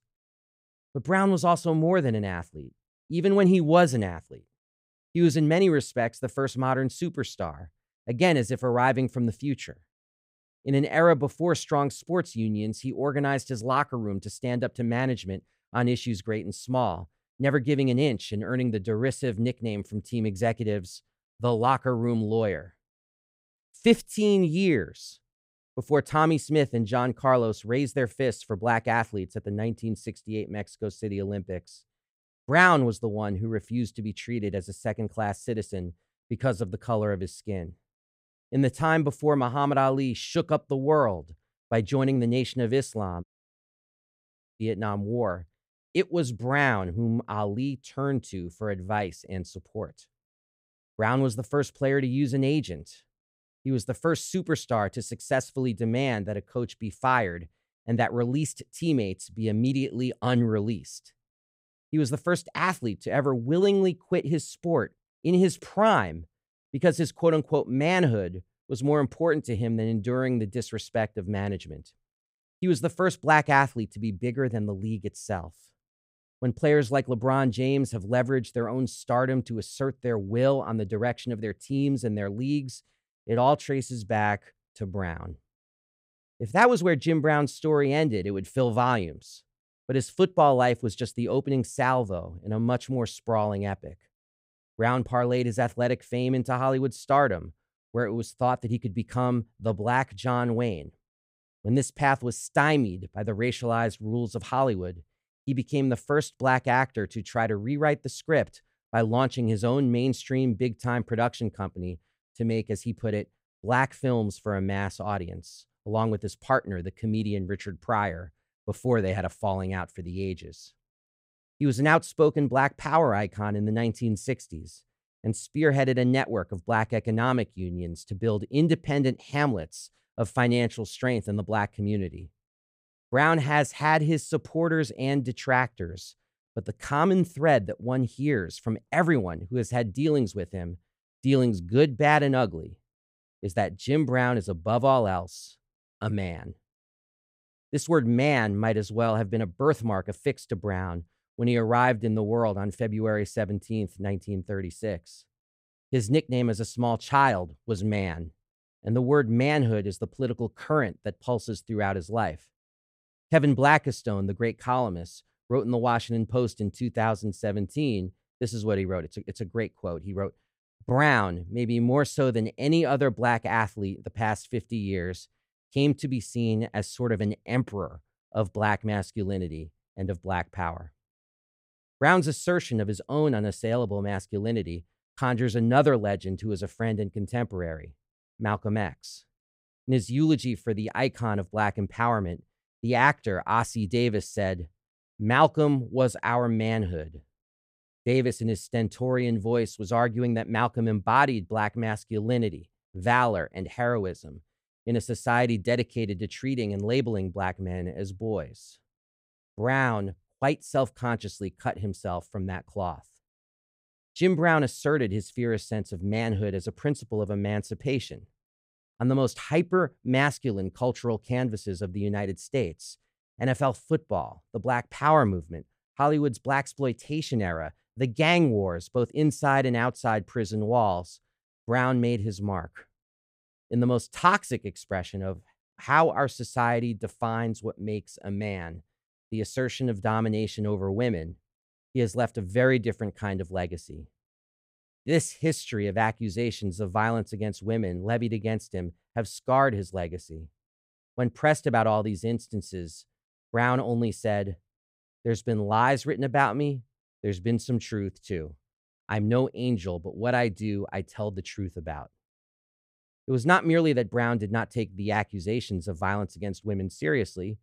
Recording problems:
audio cutting out; at 43 s for 1.5 s

